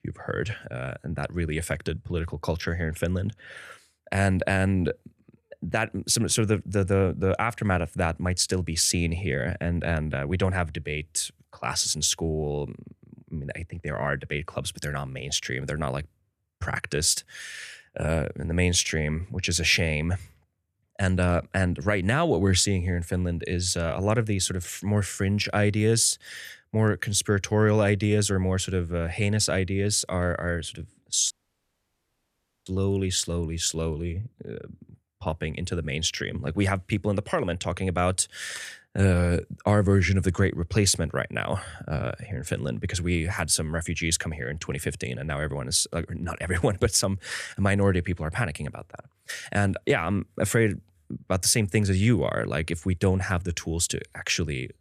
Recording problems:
audio cutting out; at 31 s for 1.5 s

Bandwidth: 14 kHz